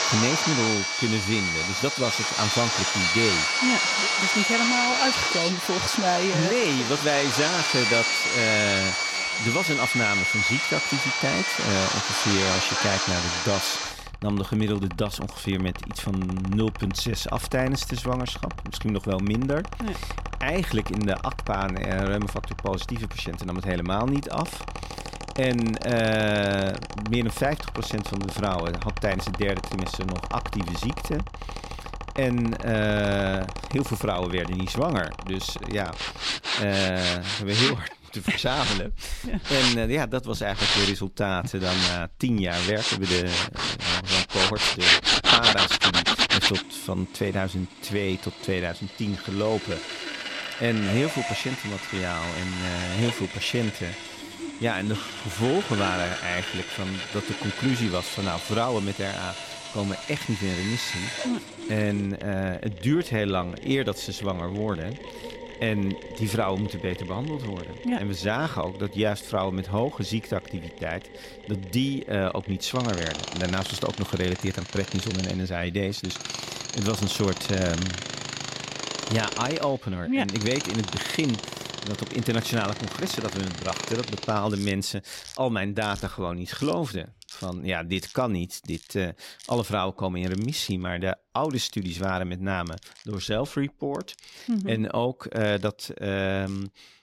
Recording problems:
machinery noise; very loud; throughout; 1 dB above the speech

